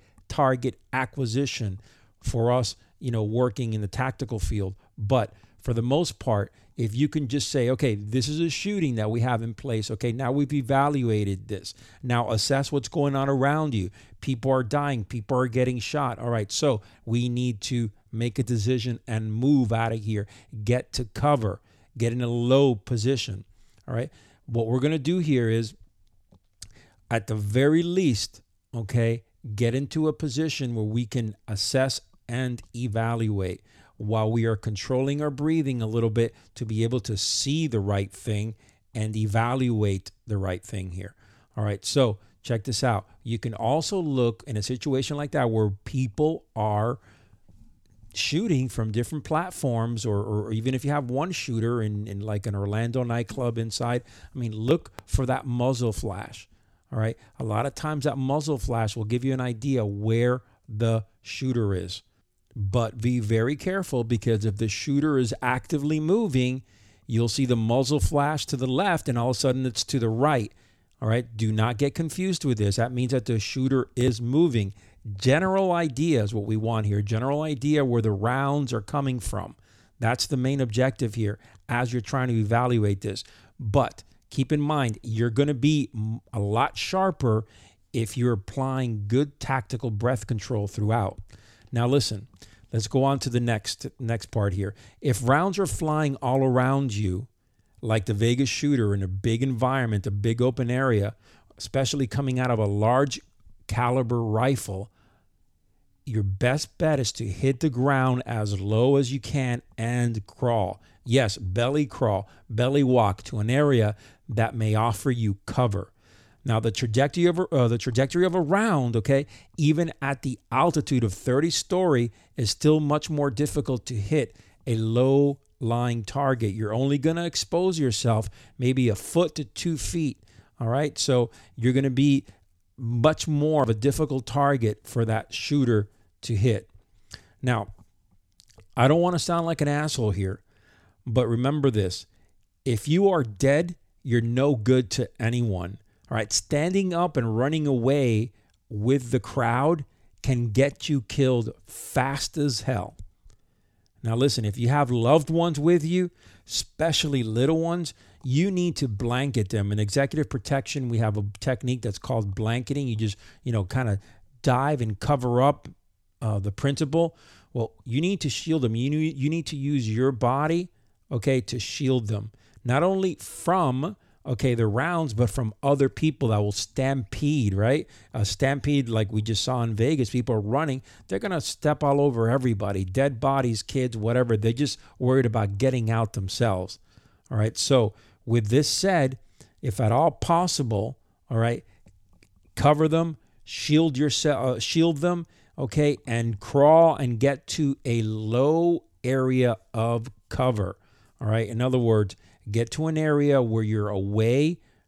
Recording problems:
none

